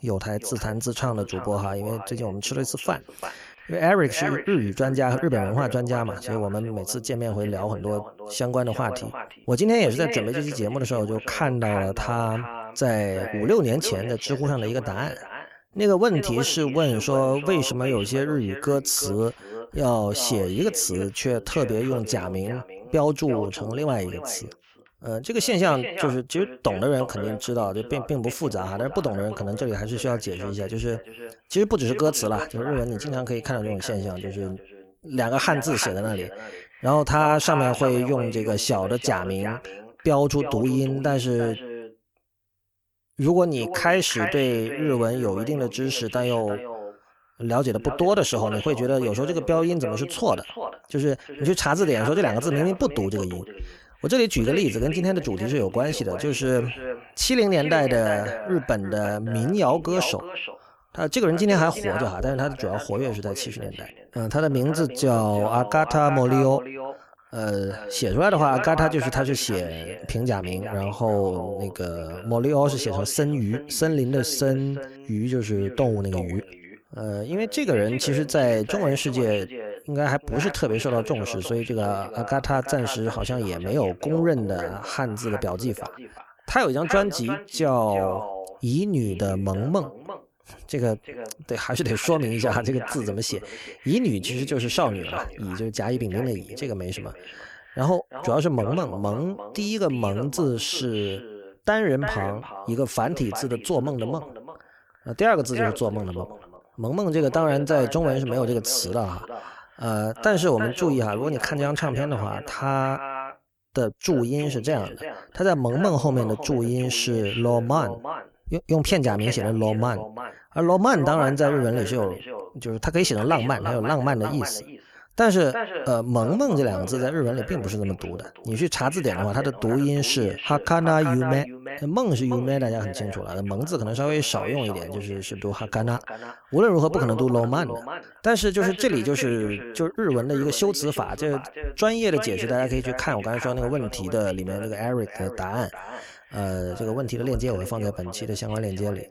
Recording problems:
echo of what is said; strong; throughout; 350 ms later, 10 dB below the speech

